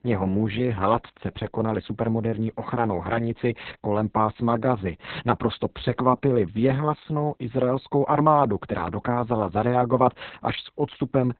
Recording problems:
garbled, watery; badly; nothing above 4 kHz

